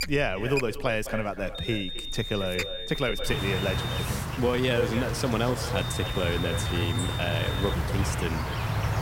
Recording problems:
echo of what is said; strong; throughout; 240 ms later, 10 dB below the speech
high-pitched whine; loud; from 1.5 to 4 s and from 6 to 7.5 s; 3.5 kHz, 6 dB below the speech
animal sounds; loud; throughout; 1 dB below the speech
uneven, jittery; strongly; from 0.5 to 8 s

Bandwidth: 16 kHz